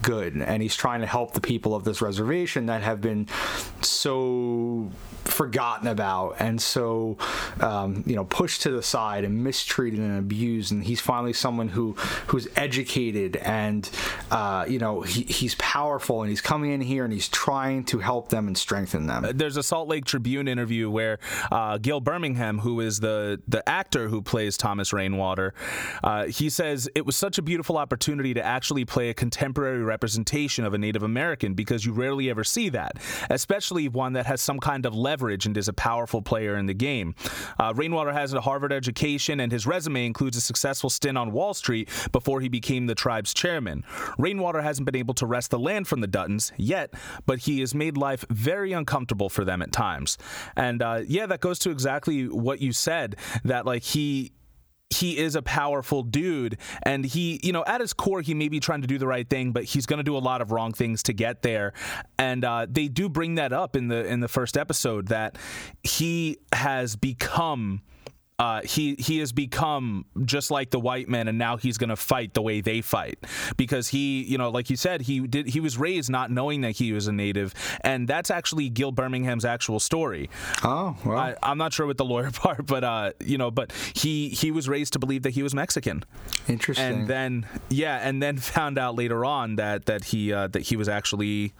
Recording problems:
squashed, flat; heavily

